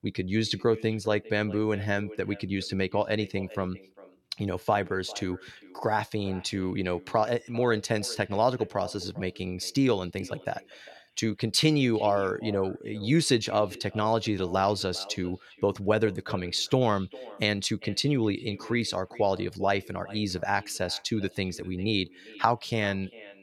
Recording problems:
echo of what is said; faint; throughout; 400 ms later, 20 dB below the speech

